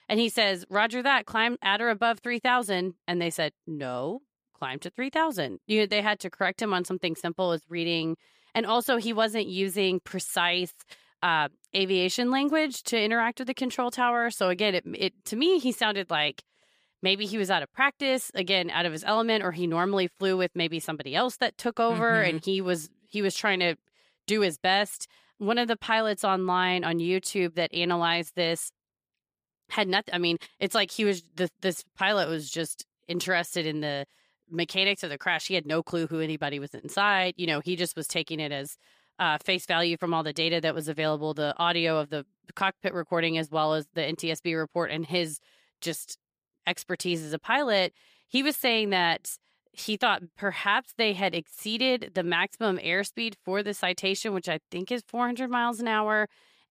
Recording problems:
none

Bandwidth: 15 kHz